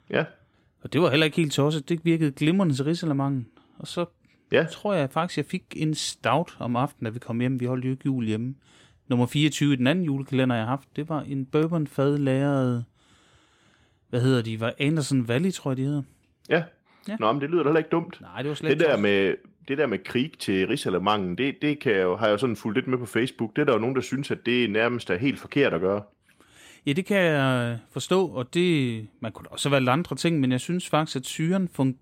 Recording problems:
none

